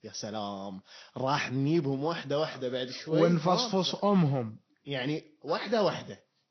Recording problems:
high frequencies cut off; noticeable; nothing above 6 kHz
garbled, watery; slightly

